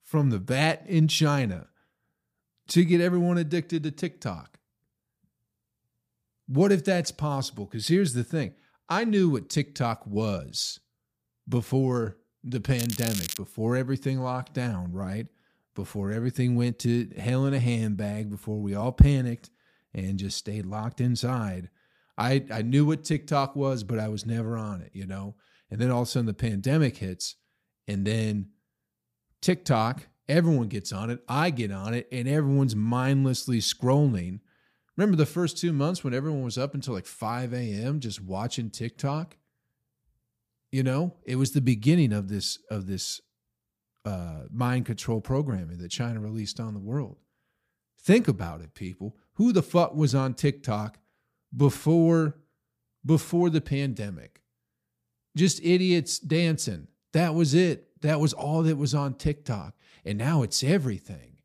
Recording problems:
crackling; loud; at 13 s; 7 dB below the speech

